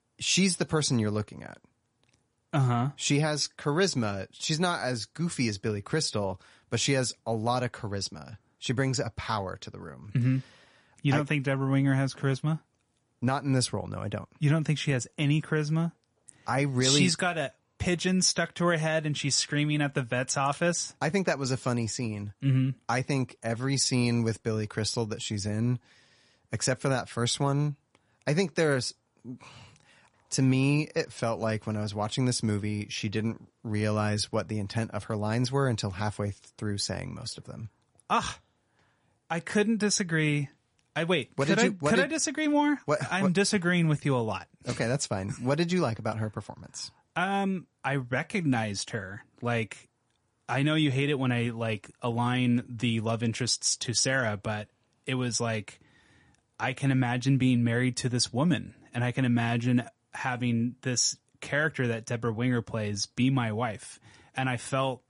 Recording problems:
garbled, watery; slightly; nothing above 10.5 kHz

